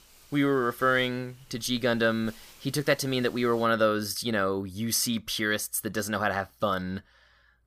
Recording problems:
hiss; faint; until 3.5 s; 25 dB below the speech

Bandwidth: 15 kHz